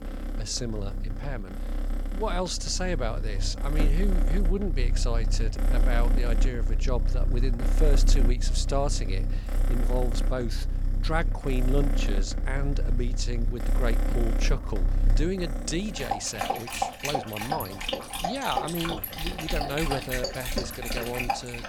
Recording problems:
animal sounds; very loud; throughout; 3 dB above the speech
voice in the background; faint; throughout; 25 dB below the speech

